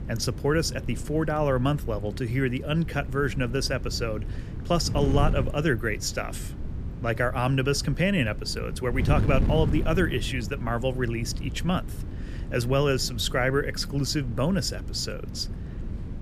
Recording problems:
wind noise on the microphone; occasional gusts; 15 dB below the speech

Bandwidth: 14.5 kHz